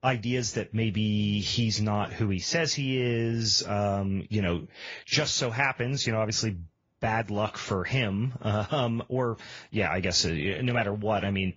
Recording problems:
high frequencies cut off; noticeable; nothing above 7 kHz
garbled, watery; slightly

